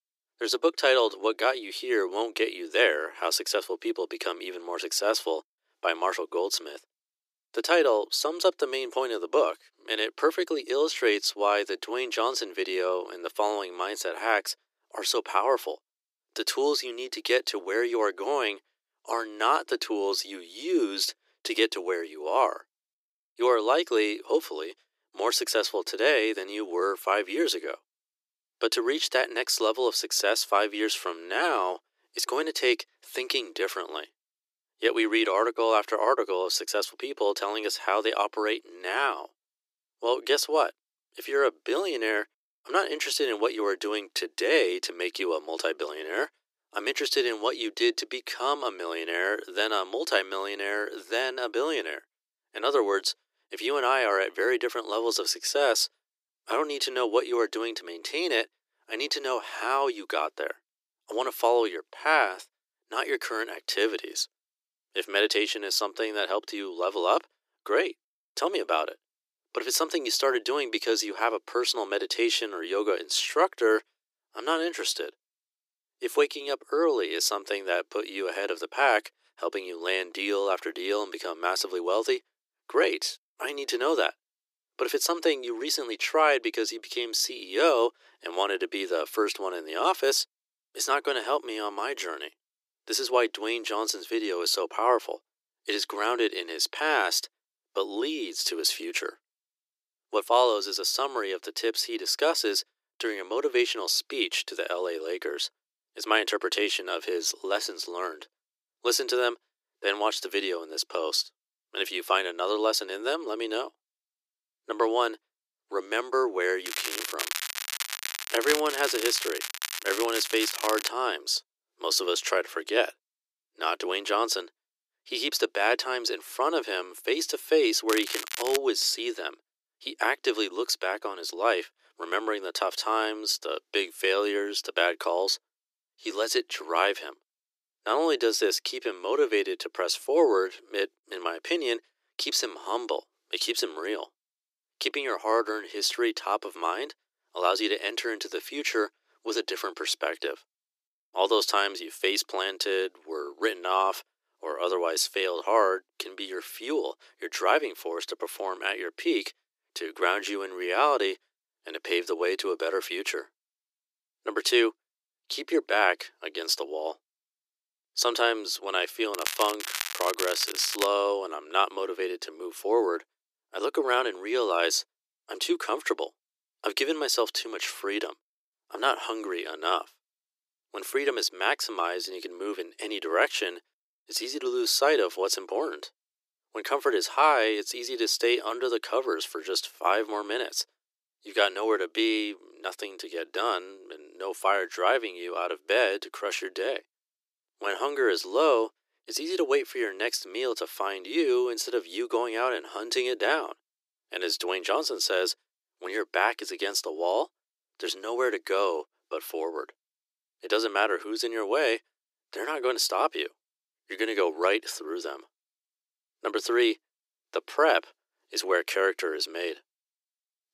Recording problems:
thin; very; fading below 350 Hz
crackling; loud; from 1:57 to 2:01, at 2:08 and from 2:49 to 2:51; 4 dB below the speech

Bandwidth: 14.5 kHz